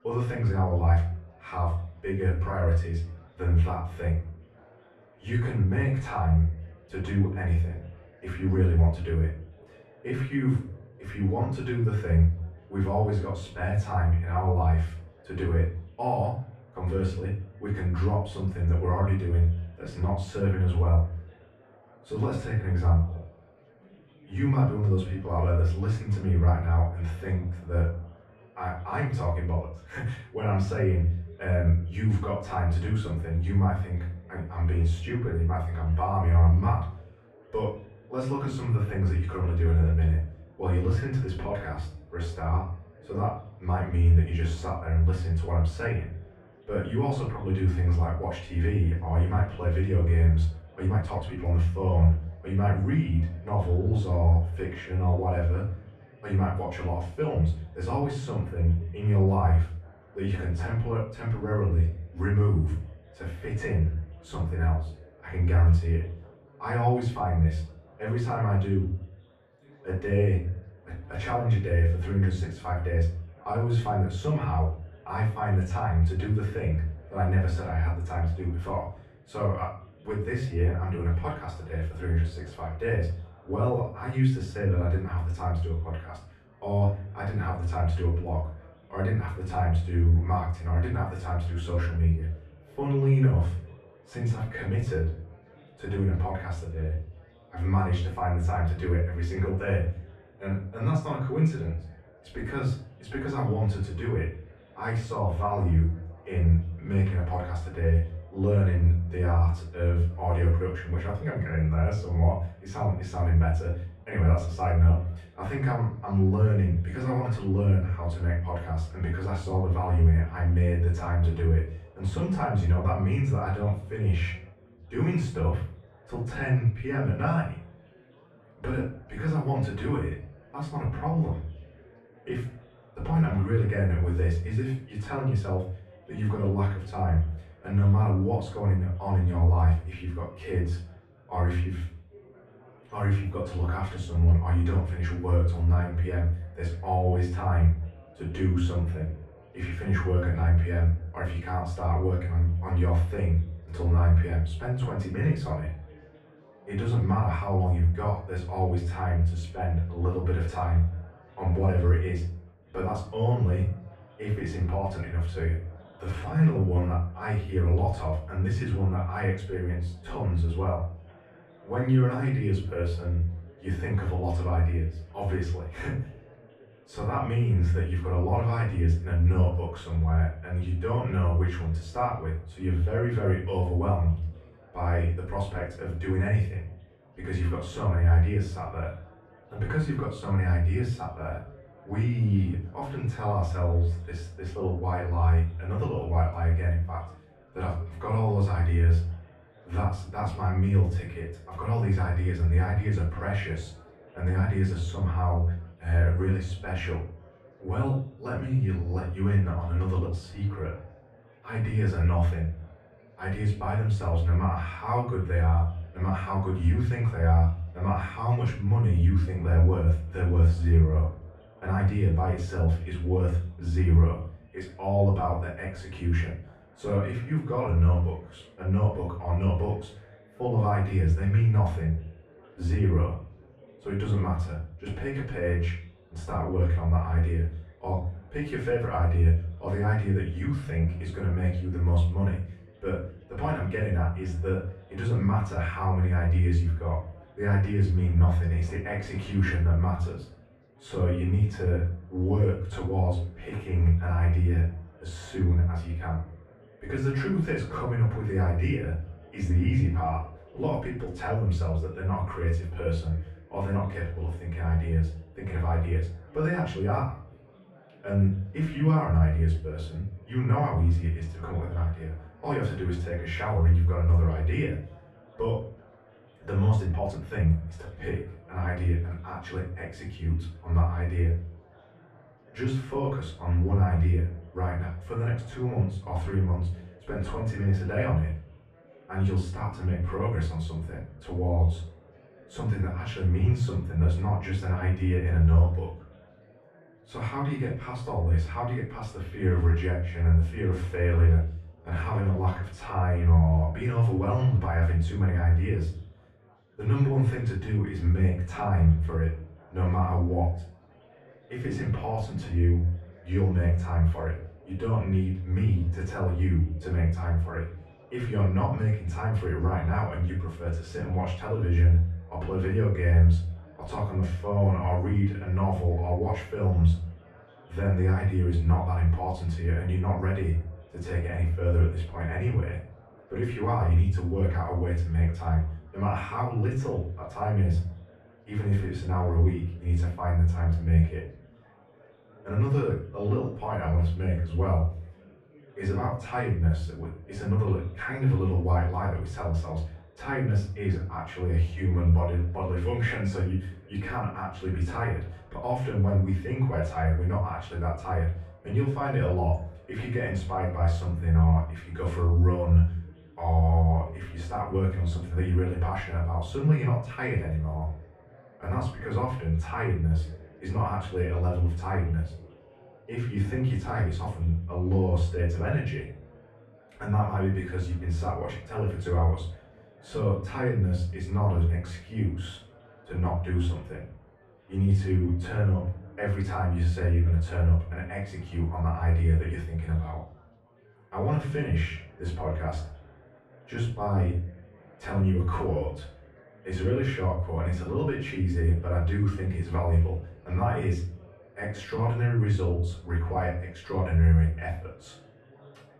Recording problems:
off-mic speech; far
muffled; very; fading above 2 kHz
room echo; noticeable; dies away in 0.4 s
chatter from many people; faint; throughout; 30 dB below the speech
uneven, jittery; strongly; from 51 s to 6:42

